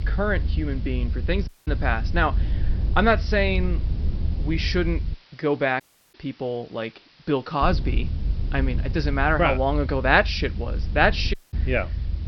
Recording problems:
high frequencies cut off; noticeable; nothing above 5.5 kHz
hiss; faint; throughout; 30 dB below the speech
low rumble; faint; until 5 s and from 7.5 s on; 20 dB below the speech
audio cutting out; at 1.5 s, at 6 s and at 11 s

